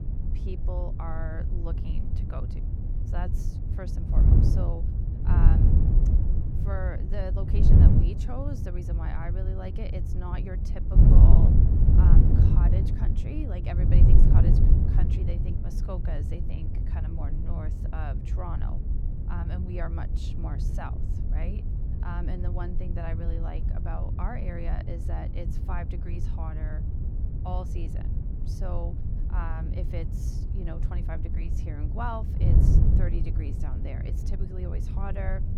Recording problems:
wind noise on the microphone; heavy; 1 dB above the speech

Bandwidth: 17.5 kHz